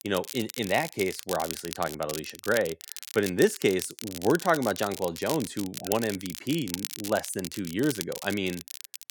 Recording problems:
crackle, like an old record; loud; 9 dB below the speech

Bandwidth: 18 kHz